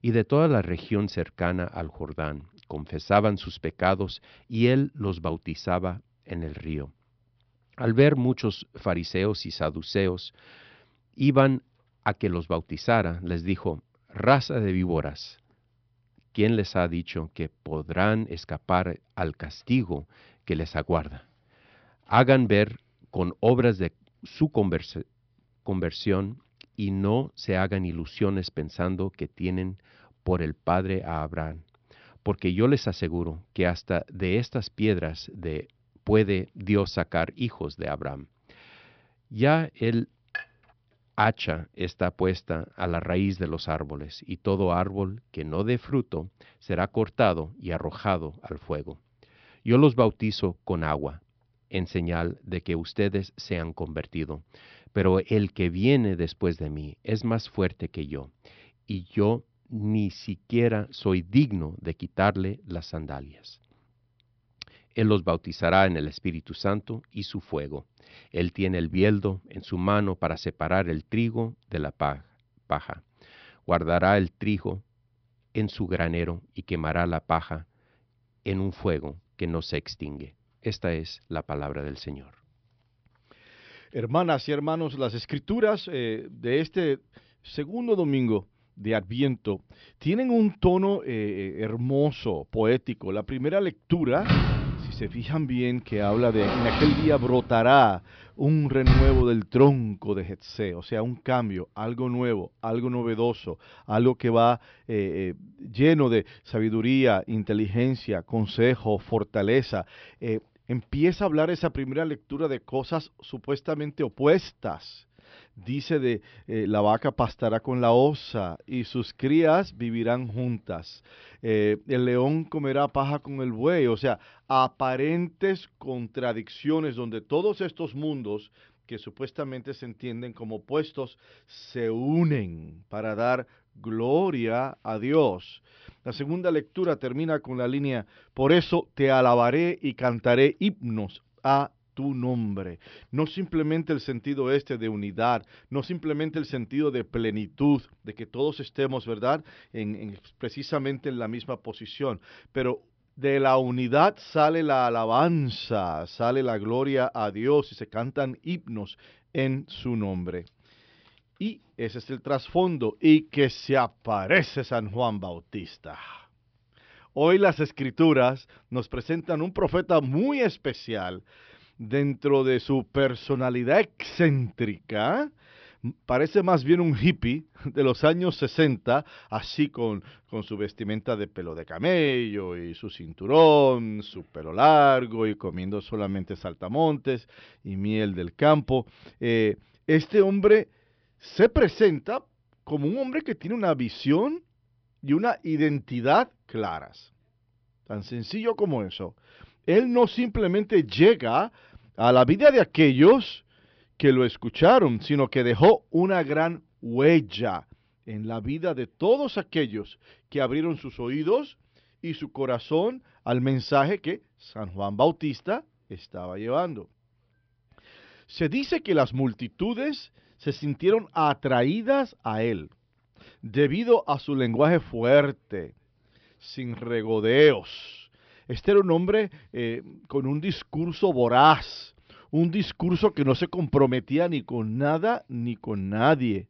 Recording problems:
high frequencies cut off; noticeable; nothing above 5.5 kHz
clattering dishes; faint; at 40 s; peak 10 dB below the speech
door banging; loud; from 1:34 to 1:39; peak 6 dB above the speech

